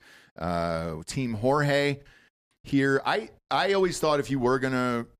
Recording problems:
none

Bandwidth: 14.5 kHz